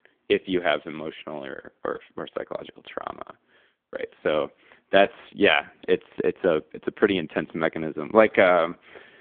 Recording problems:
phone-call audio; poor line; nothing above 3.5 kHz

